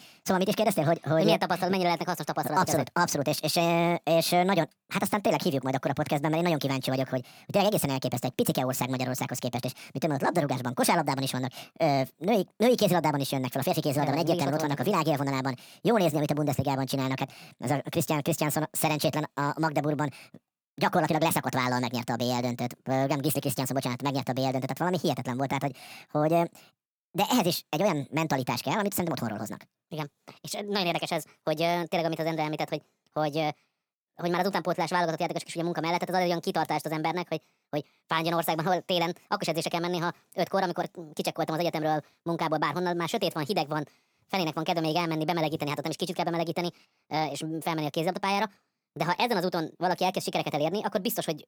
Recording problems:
wrong speed and pitch; too fast and too high; 1.5 times normal speed

